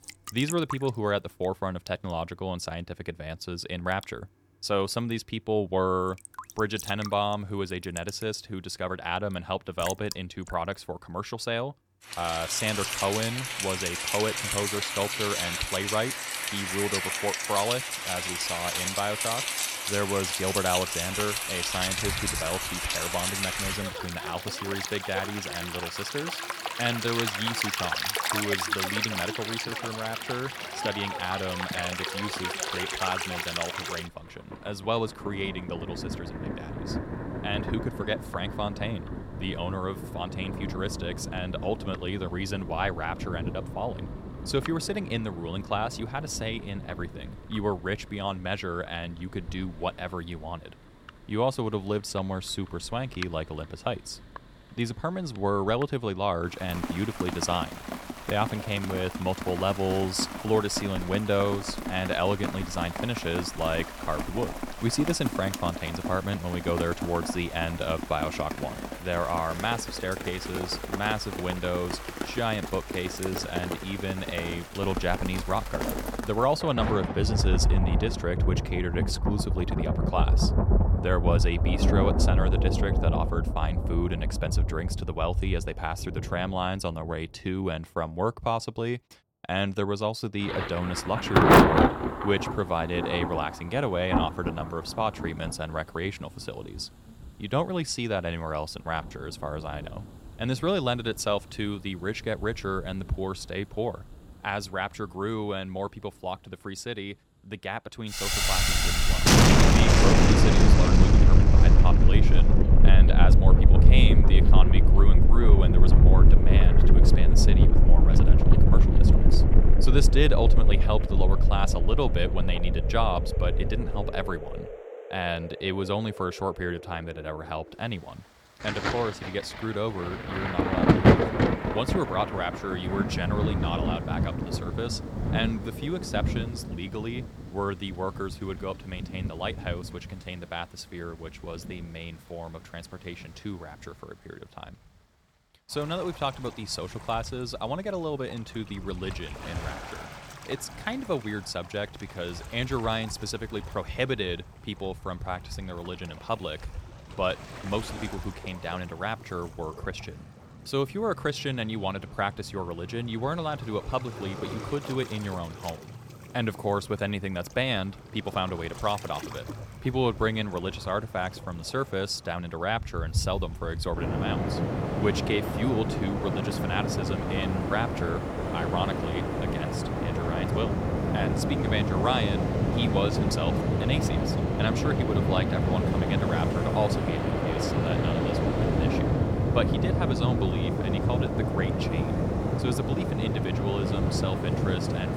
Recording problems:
rain or running water; very loud; throughout; 5 dB above the speech

